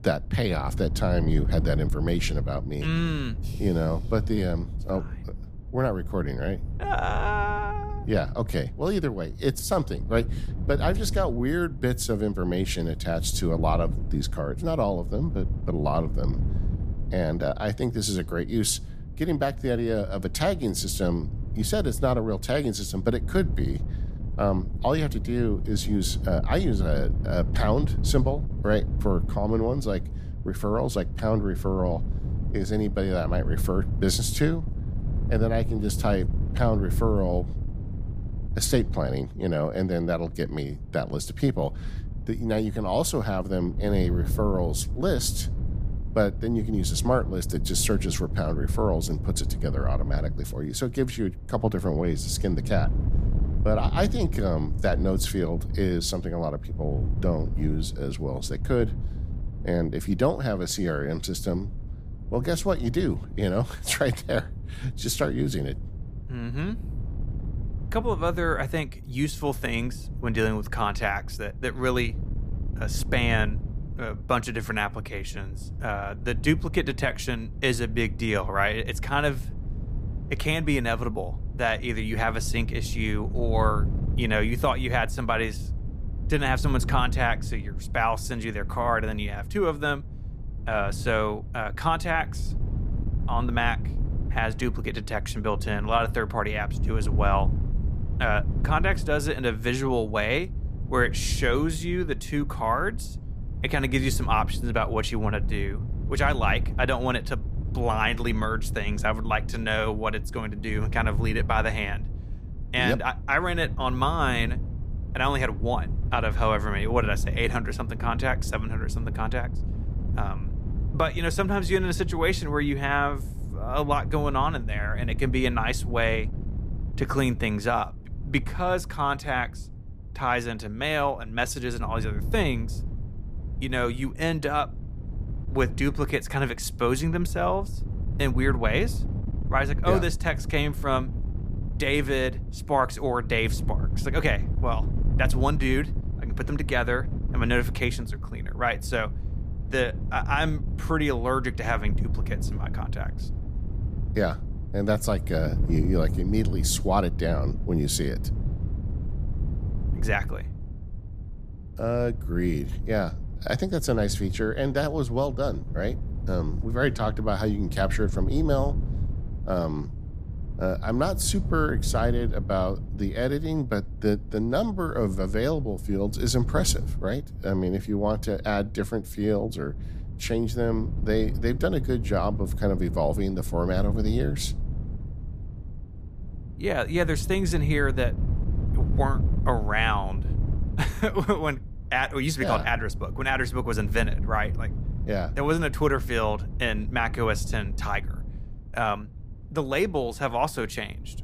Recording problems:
wind noise on the microphone; occasional gusts; 15 dB below the speech

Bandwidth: 15 kHz